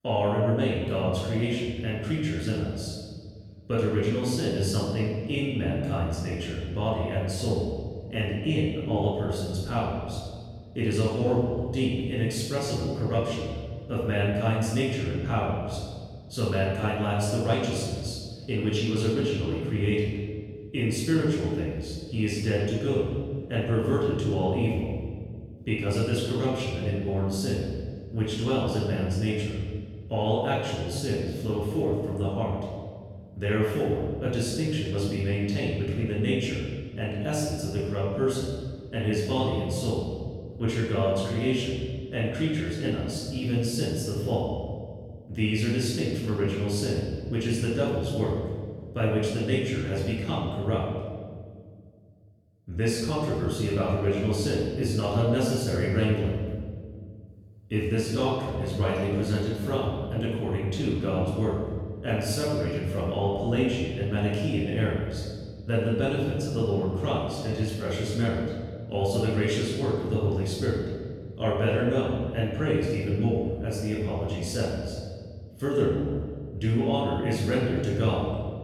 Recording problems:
off-mic speech; far
room echo; noticeable; dies away in 1.7 s

